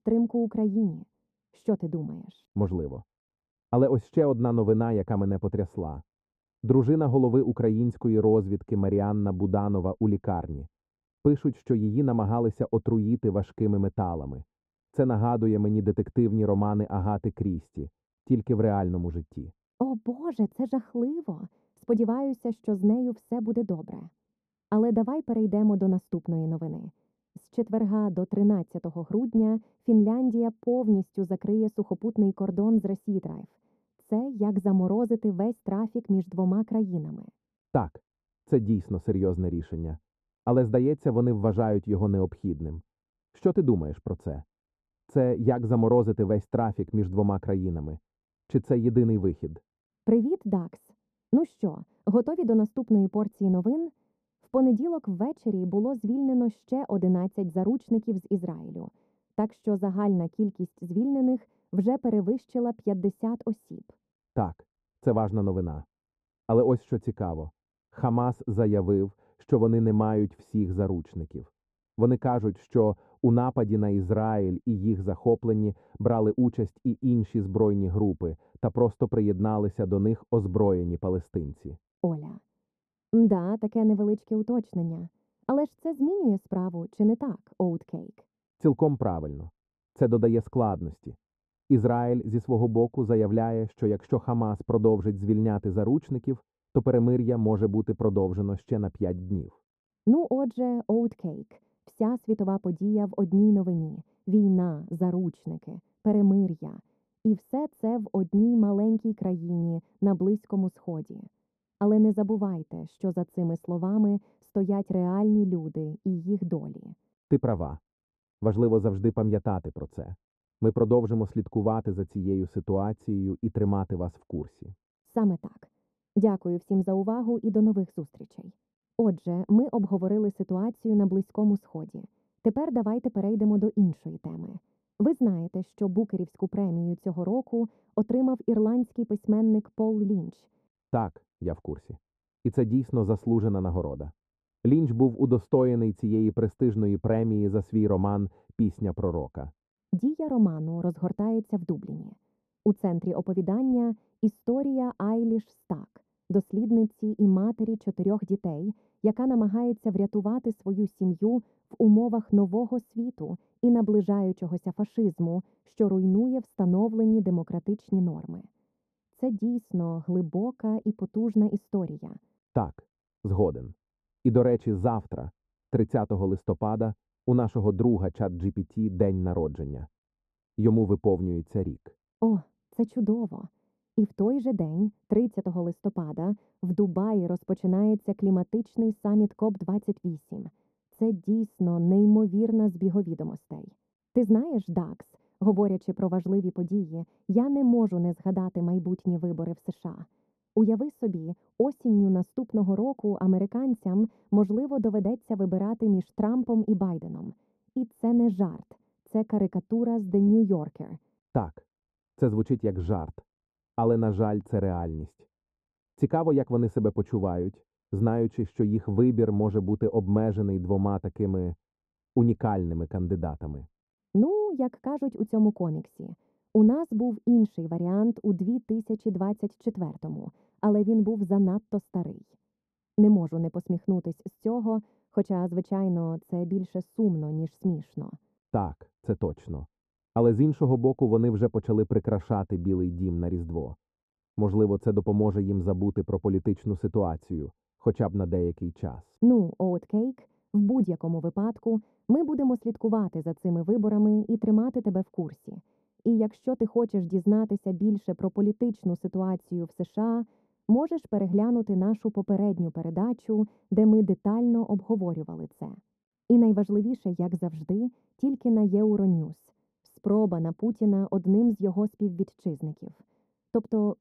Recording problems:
muffled; very; fading above 1 kHz

